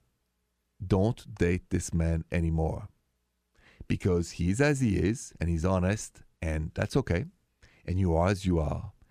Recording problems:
none

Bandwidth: 14.5 kHz